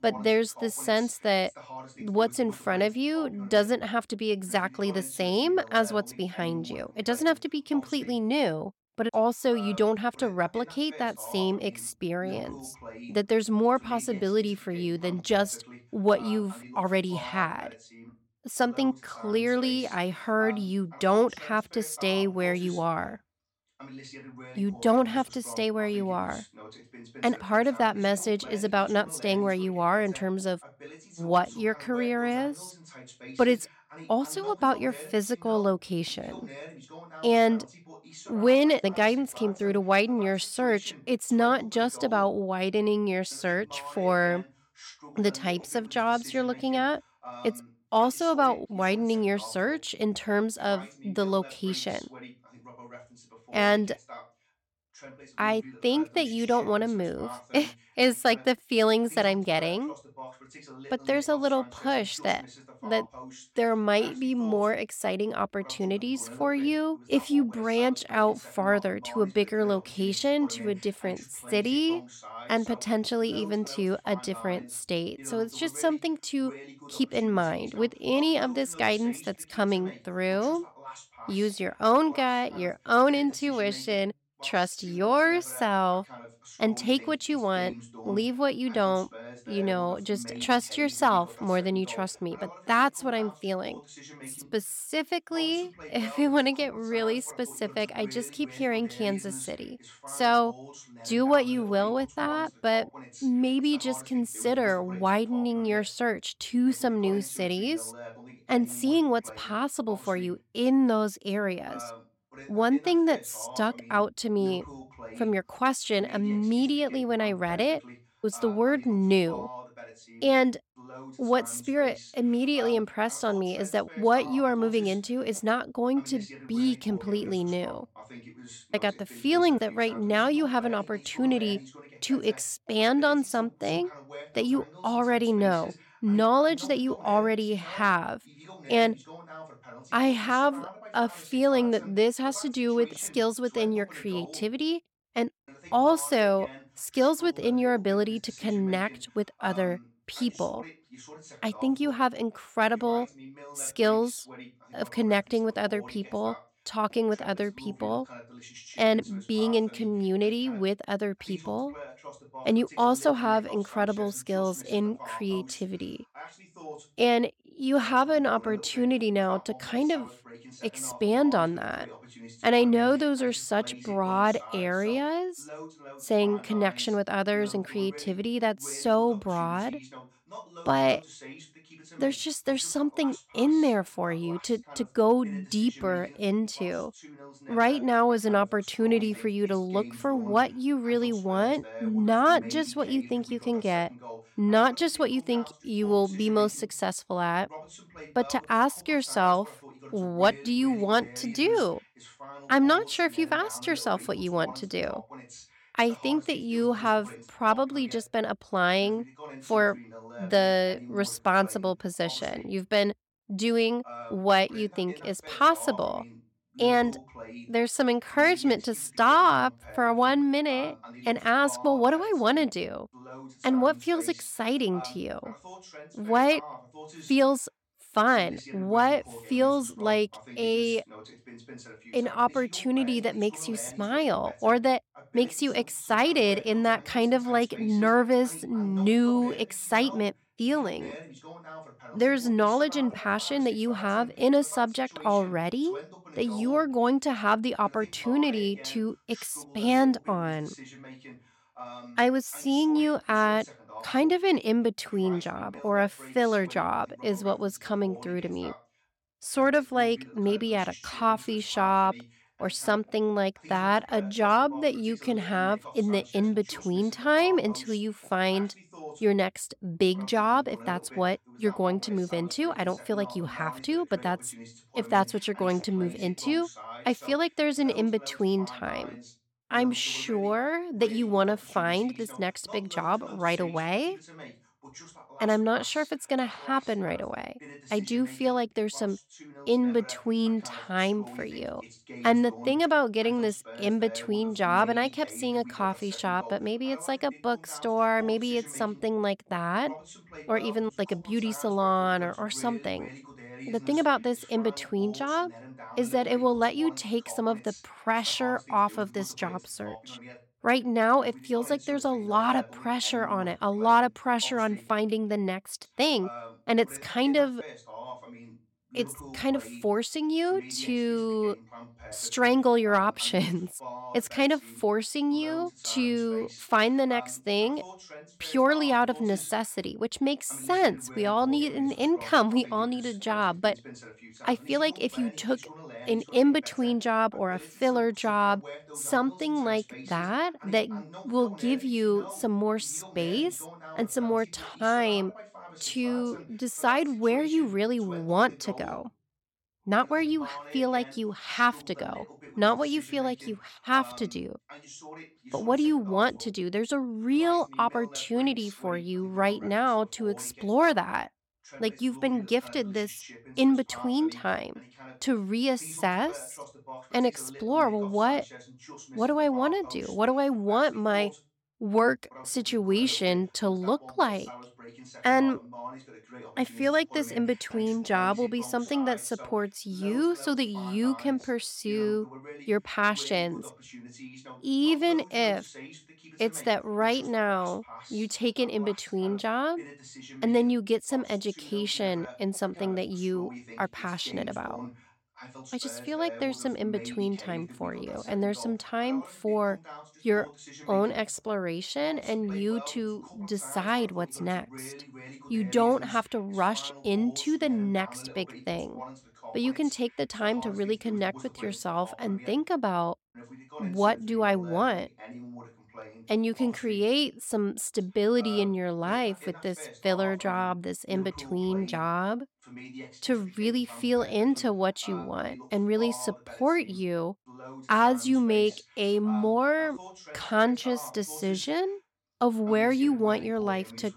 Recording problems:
voice in the background; noticeable; throughout; 20 dB below the speech

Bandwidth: 17 kHz